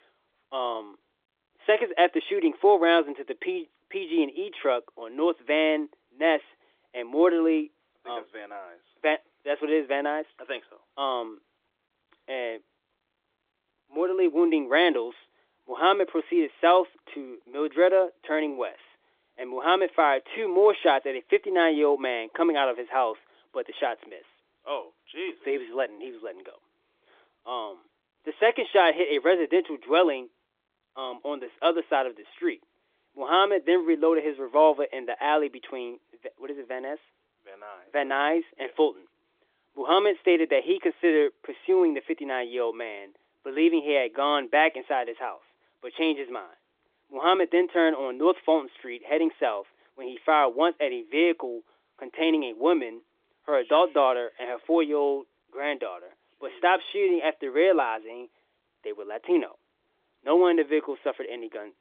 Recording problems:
phone-call audio; nothing above 3.5 kHz

